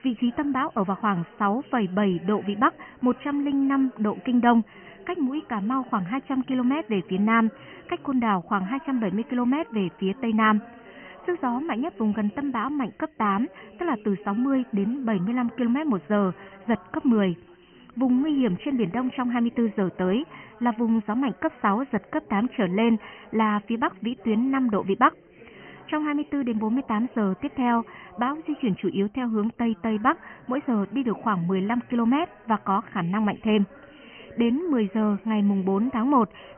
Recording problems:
high frequencies cut off; severe; nothing above 3 kHz
background chatter; faint; throughout; 4 voices, 20 dB below the speech

